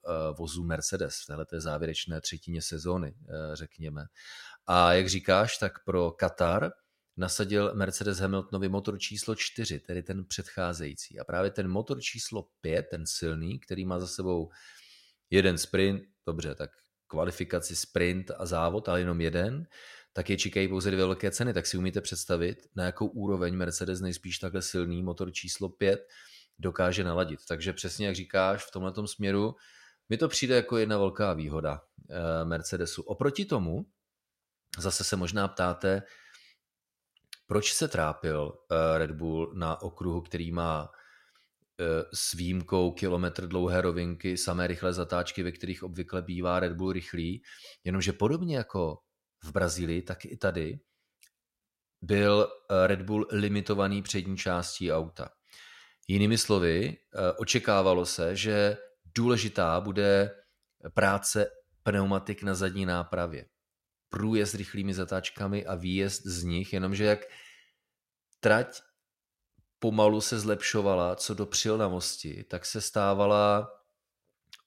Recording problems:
none

